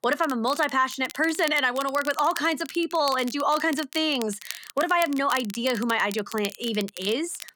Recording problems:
crackle, like an old record; noticeable; 15 dB below the speech

